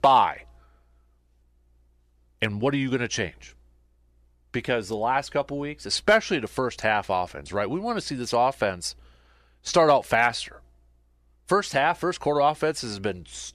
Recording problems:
none

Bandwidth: 14.5 kHz